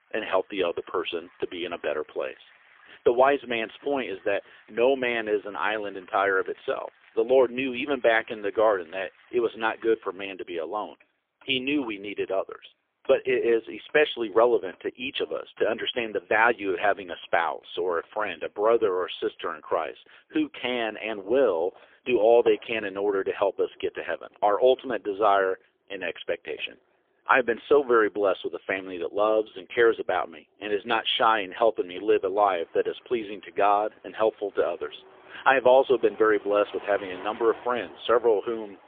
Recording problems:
phone-call audio; poor line; nothing above 3.5 kHz
traffic noise; faint; throughout; 25 dB below the speech

